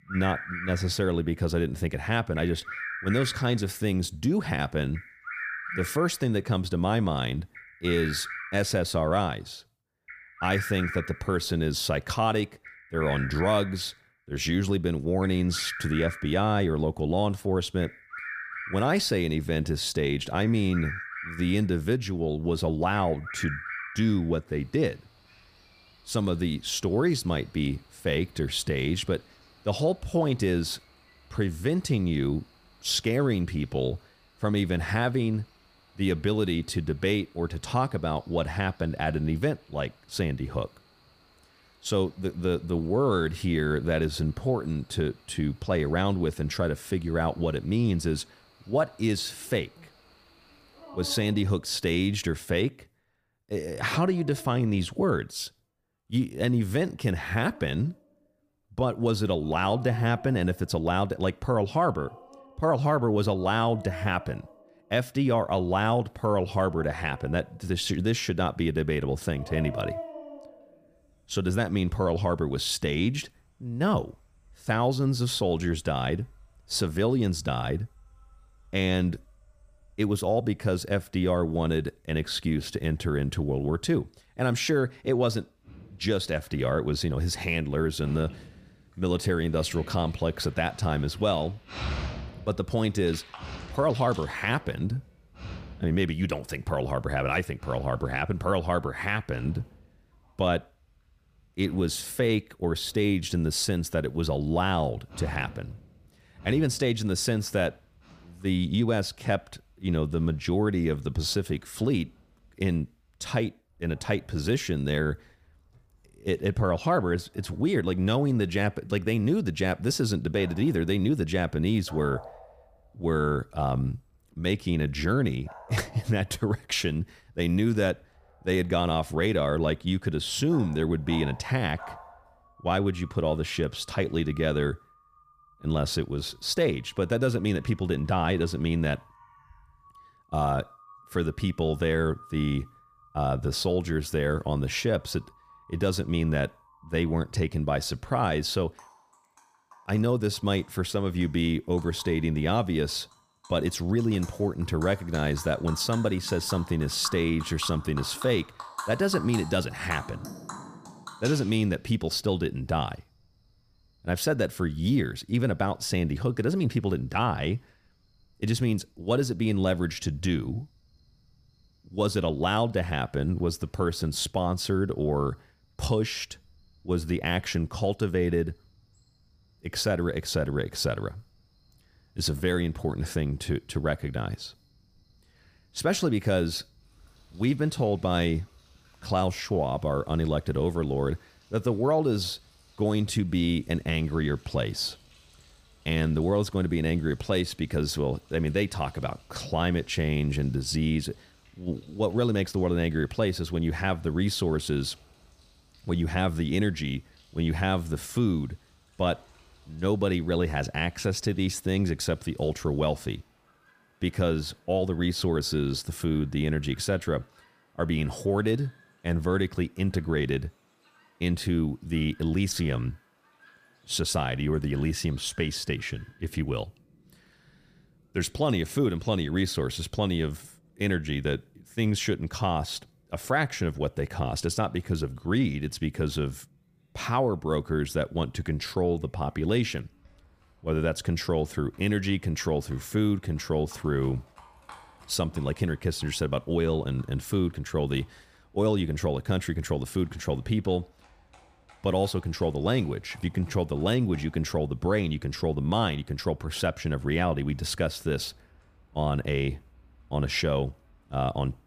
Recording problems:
animal sounds; noticeable; throughout; 15 dB below the speech

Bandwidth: 15 kHz